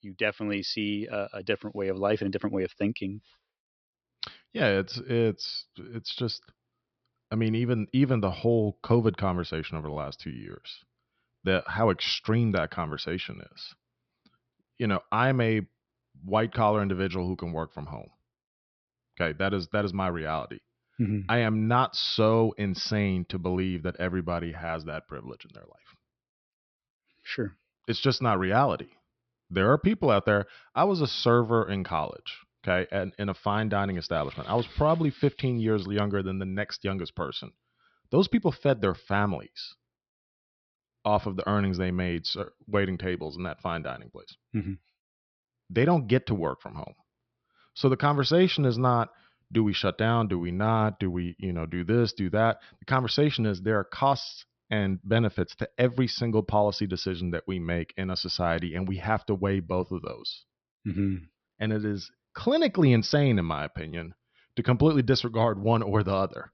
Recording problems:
high frequencies cut off; noticeable; nothing above 5.5 kHz

